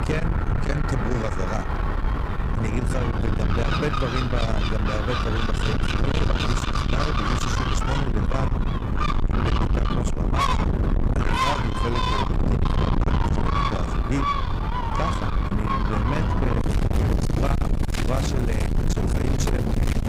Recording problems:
distortion; heavy; 7 dB below the speech
animal sounds; very loud; throughout; 1 dB above the speech
wind noise on the microphone; heavy; 1 dB below the speech

